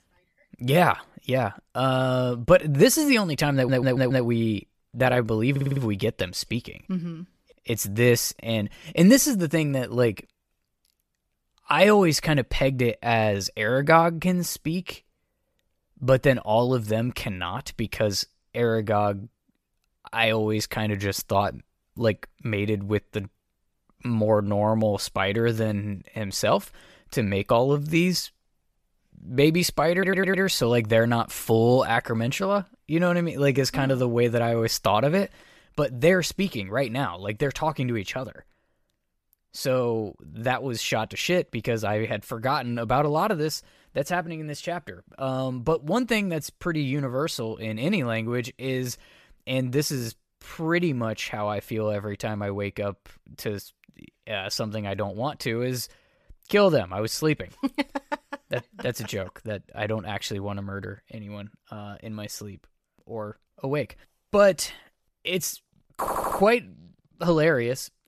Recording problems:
audio stuttering; 4 times, first at 3.5 s

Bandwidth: 14.5 kHz